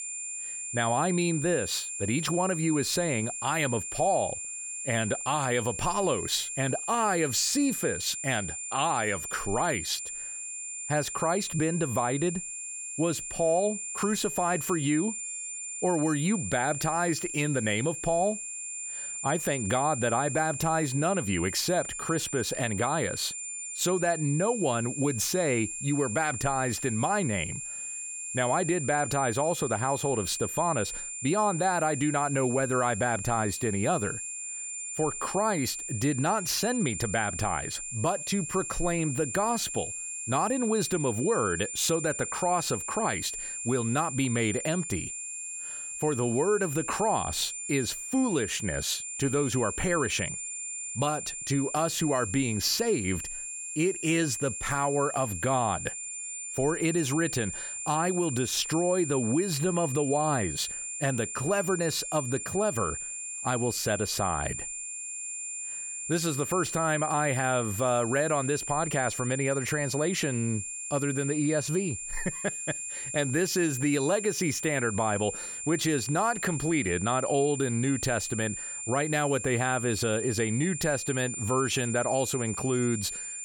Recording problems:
high-pitched whine; loud; throughout; 7 kHz, 5 dB below the speech

